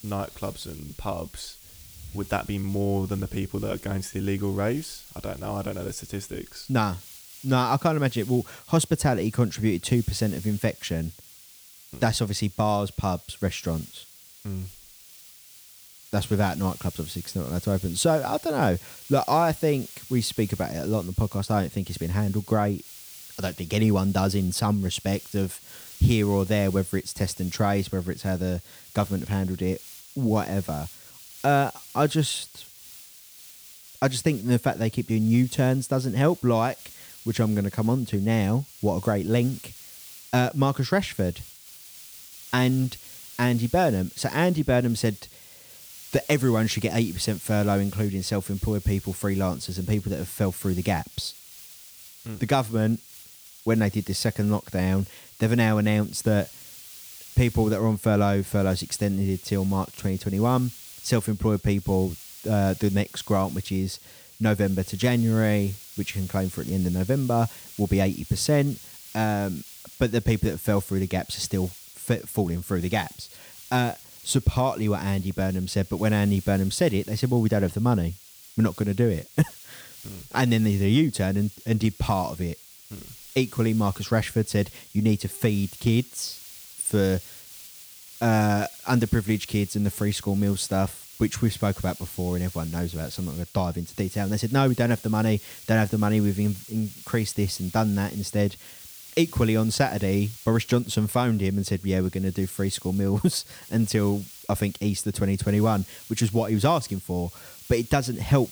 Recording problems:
hiss; noticeable; throughout; 15 dB below the speech

